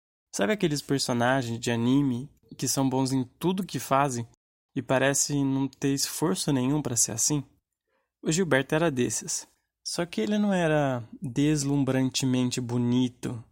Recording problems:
none

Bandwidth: 16 kHz